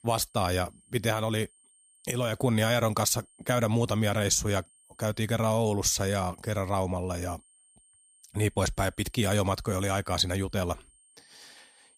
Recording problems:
high-pitched whine; faint; throughout; 8.5 kHz, 30 dB below the speech

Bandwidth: 15 kHz